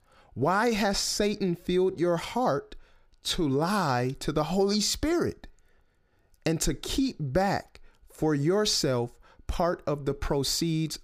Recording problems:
none

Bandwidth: 15 kHz